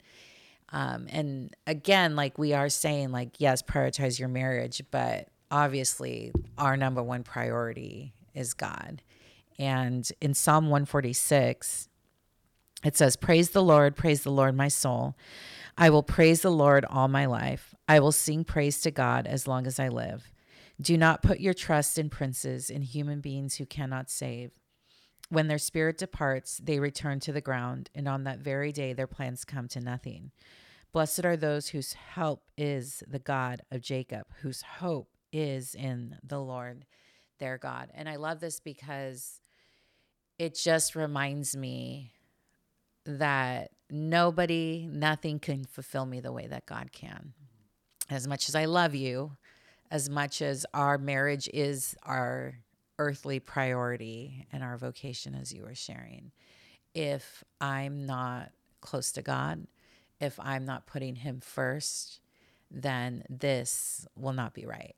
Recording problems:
none

